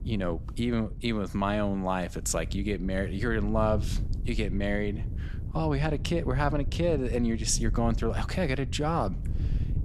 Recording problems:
wind noise on the microphone; occasional gusts; 20 dB below the speech

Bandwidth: 13.5 kHz